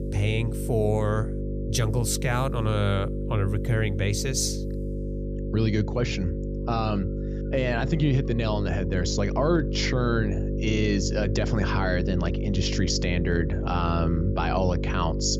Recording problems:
electrical hum; loud; throughout; 50 Hz, 8 dB below the speech

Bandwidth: 14.5 kHz